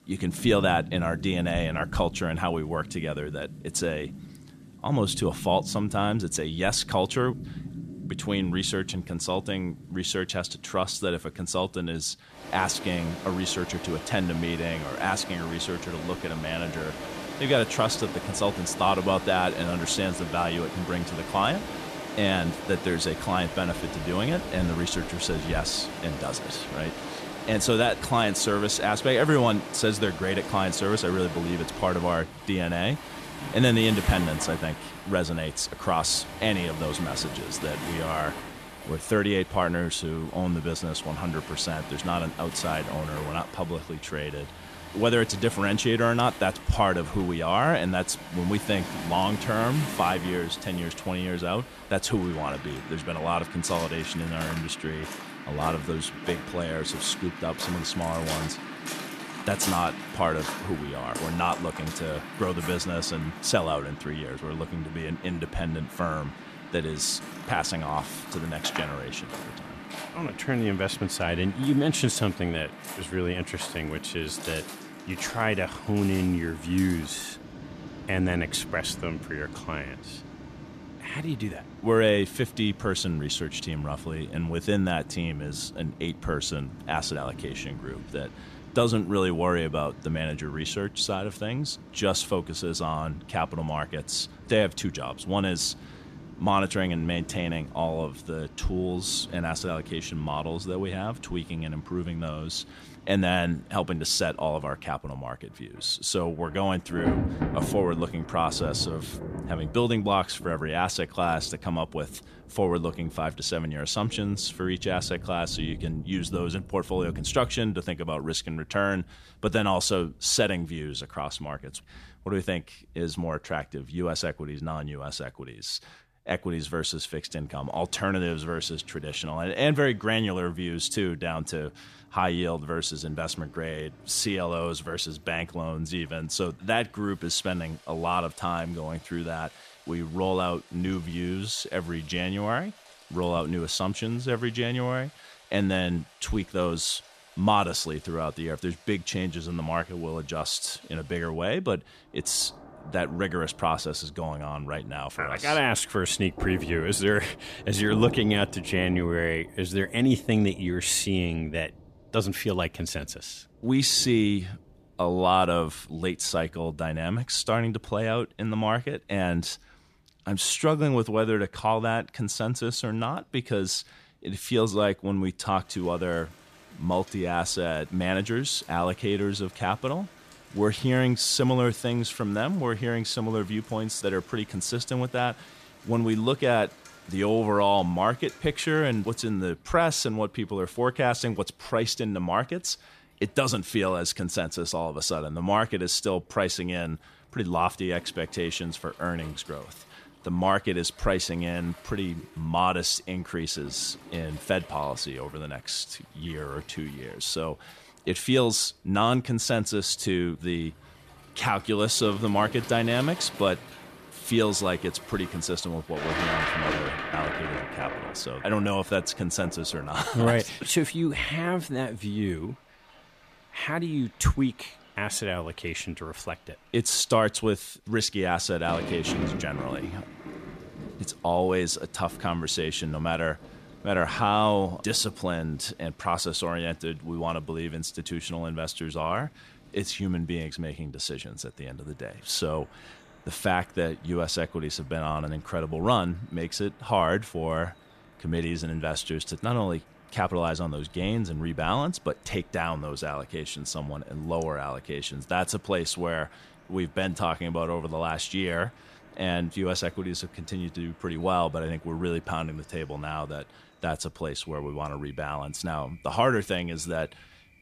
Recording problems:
rain or running water; noticeable; throughout; 10 dB below the speech

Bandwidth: 14.5 kHz